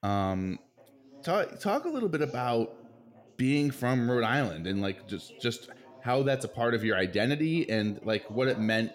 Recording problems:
background chatter; faint; throughout; 3 voices, 25 dB below the speech

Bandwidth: 16 kHz